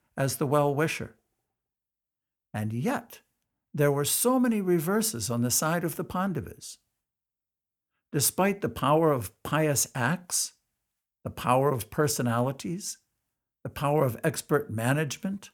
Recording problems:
none

